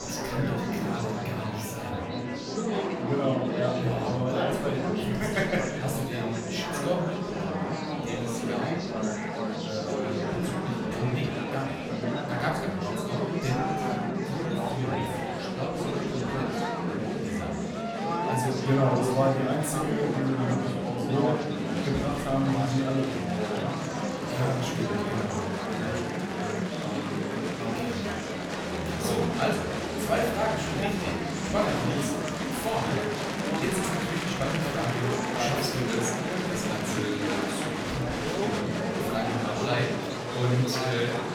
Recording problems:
off-mic speech; far
room echo; noticeable; dies away in 0.7 s
murmuring crowd; very loud; throughout; 1 dB above the speech
background music; faint; throughout; 20 dB below the speech

